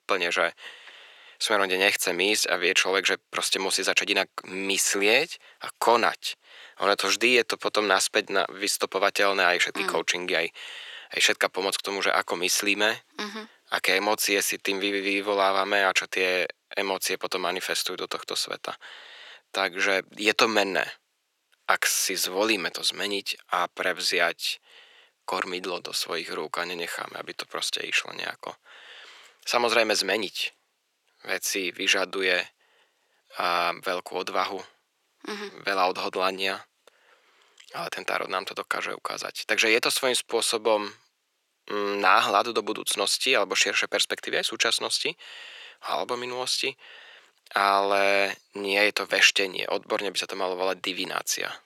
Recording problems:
thin; very; fading below 400 Hz

